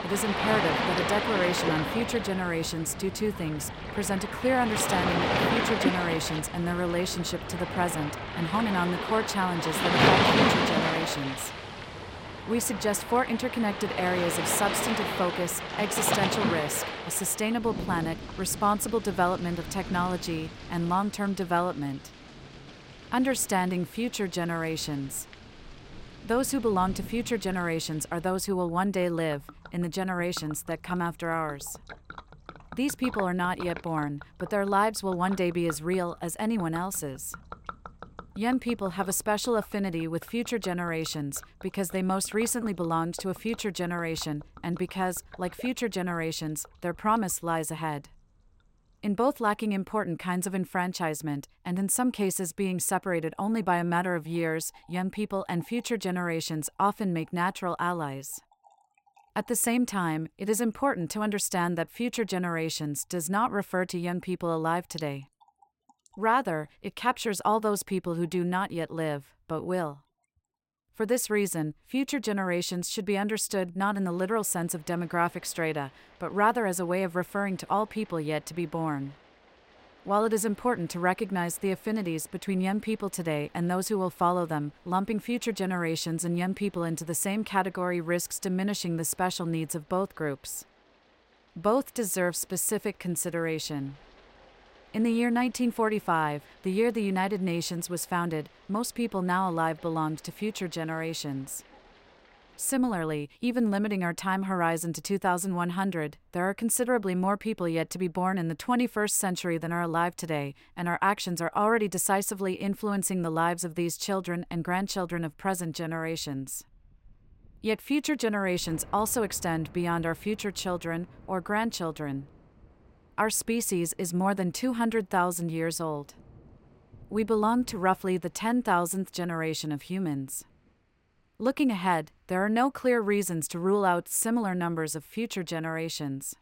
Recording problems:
rain or running water; loud; throughout; 3 dB below the speech

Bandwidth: 16 kHz